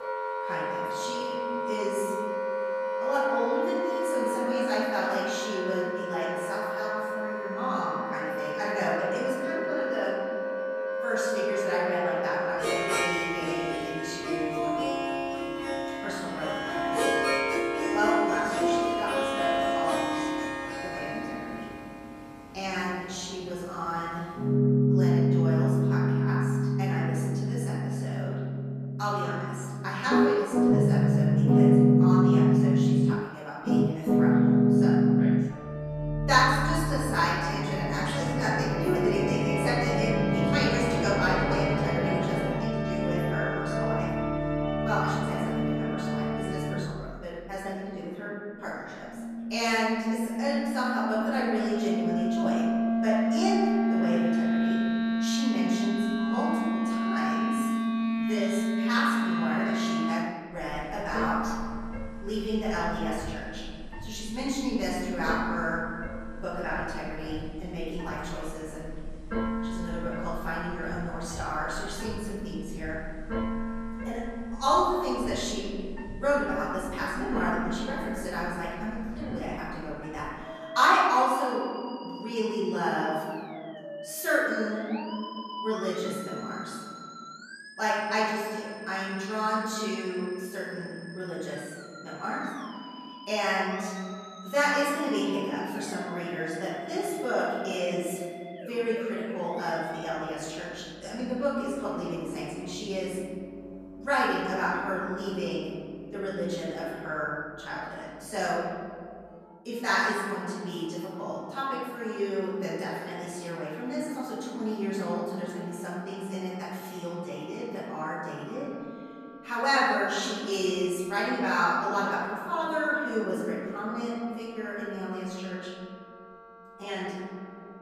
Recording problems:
room echo; strong; dies away in 2.4 s
off-mic speech; far
background music; very loud; throughout; 3 dB above the speech

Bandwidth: 14.5 kHz